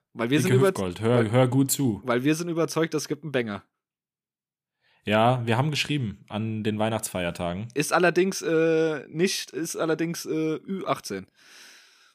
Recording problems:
none

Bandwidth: 15 kHz